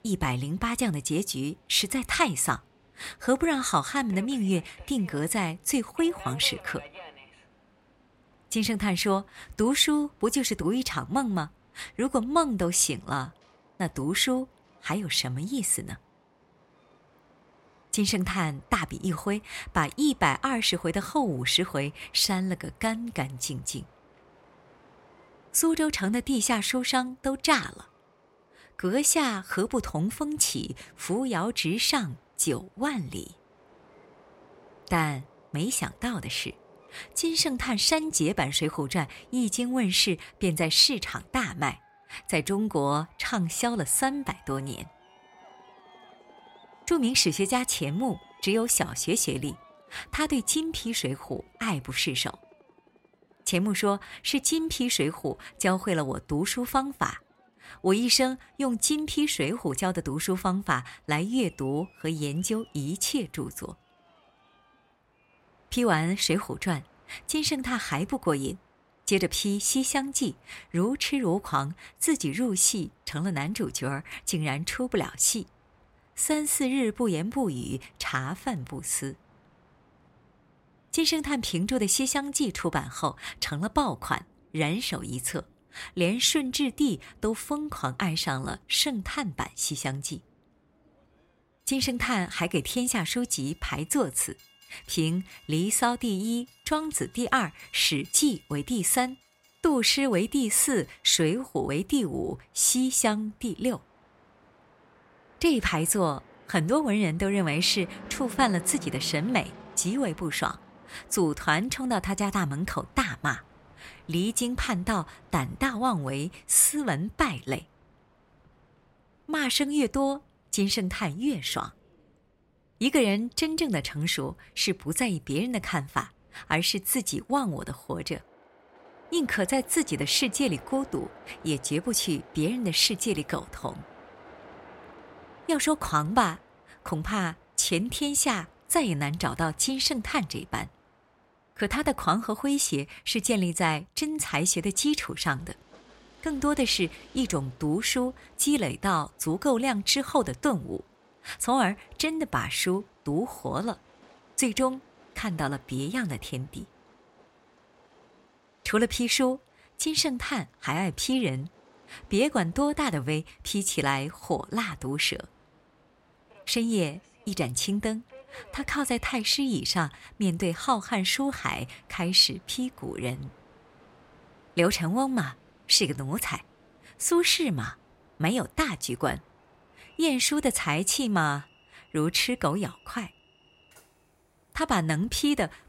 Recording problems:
train or aircraft noise; faint; throughout; 30 dB below the speech

